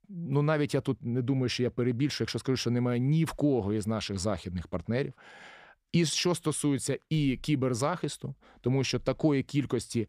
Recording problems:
none

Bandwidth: 15 kHz